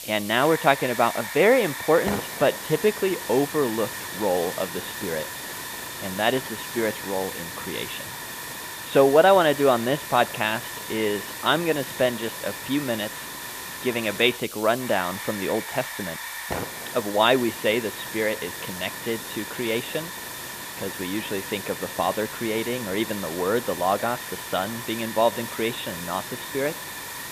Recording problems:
high frequencies cut off; severe; nothing above 4 kHz
hiss; loud; throughout; 8 dB below the speech

